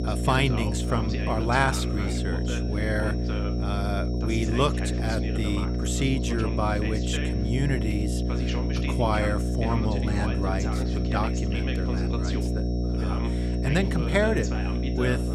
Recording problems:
electrical hum; loud; throughout; 60 Hz, 7 dB below the speech
voice in the background; loud; throughout; 9 dB below the speech
high-pitched whine; noticeable; throughout; 5.5 kHz, 20 dB below the speech

